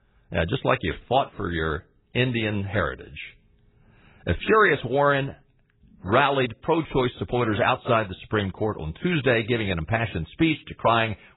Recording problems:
garbled, watery; badly; nothing above 4 kHz

